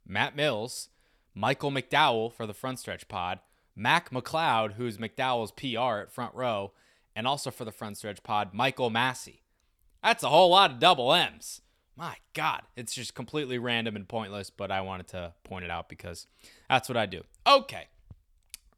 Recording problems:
none

